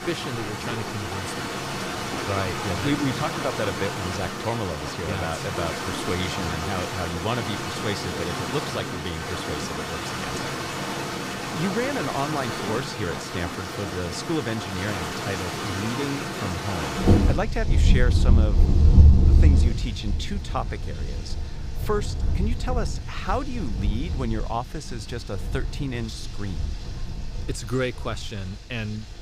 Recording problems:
rain or running water; very loud; throughout; 4 dB above the speech
household noises; noticeable; throughout; 10 dB below the speech

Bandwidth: 15.5 kHz